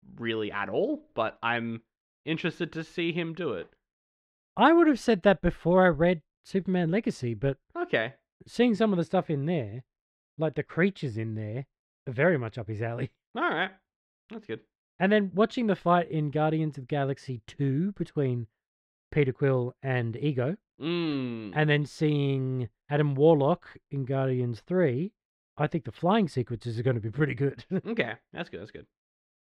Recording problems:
muffled; slightly; fading above 3 kHz

